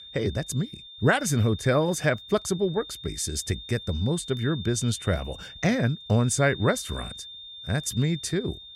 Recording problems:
high-pitched whine; noticeable; throughout; 3.5 kHz, 15 dB below the speech

